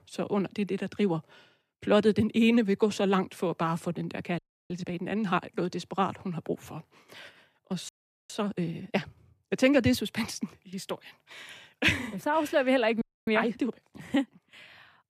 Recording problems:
audio freezing; at 4.5 s, at 8 s and at 13 s

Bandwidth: 14.5 kHz